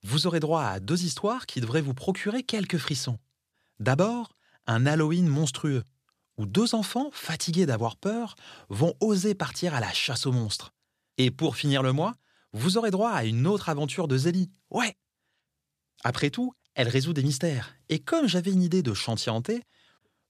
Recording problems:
none

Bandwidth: 14.5 kHz